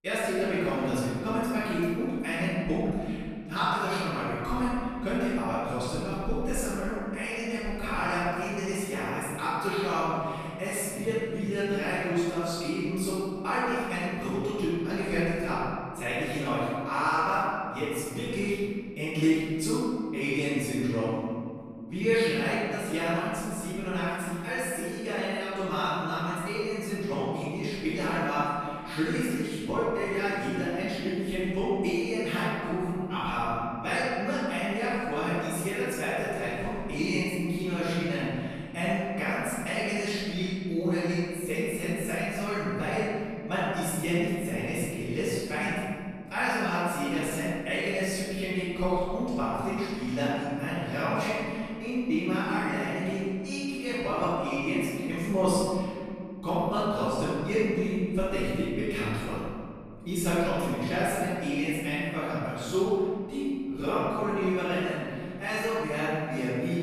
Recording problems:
room echo; strong; dies away in 2.2 s
off-mic speech; far

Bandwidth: 13.5 kHz